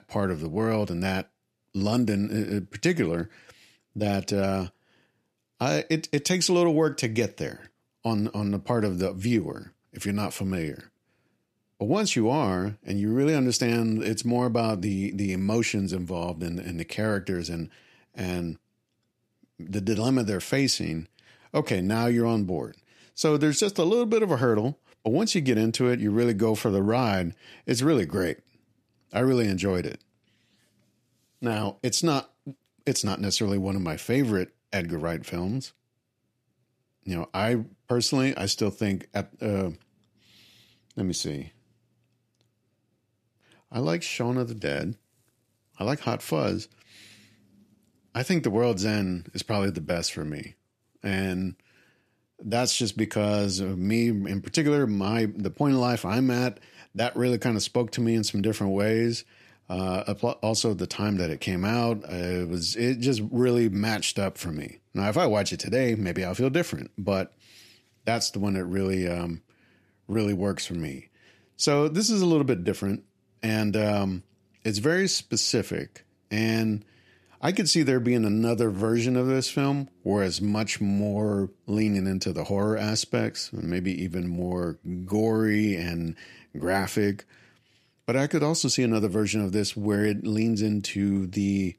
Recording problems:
none

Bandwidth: 14.5 kHz